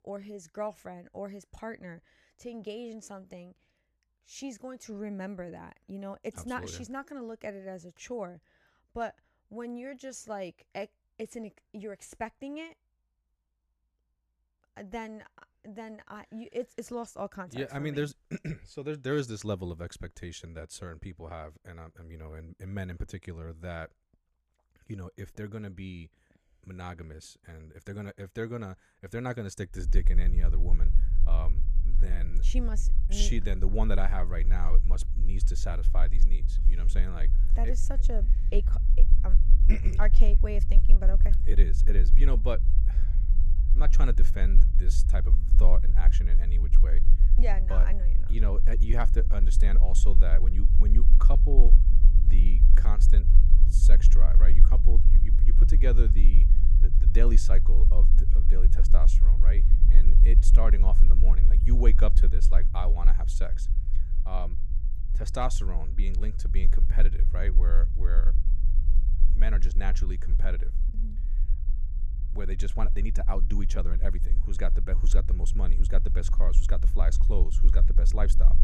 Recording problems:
low rumble; loud; from 30 s on; 10 dB below the speech

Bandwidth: 14.5 kHz